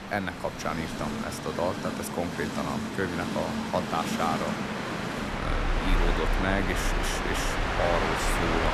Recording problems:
train or aircraft noise; very loud; throughout; 2 dB above the speech
abrupt cut into speech; at the end

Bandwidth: 13.5 kHz